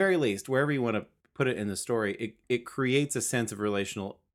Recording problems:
abrupt cut into speech; at the start

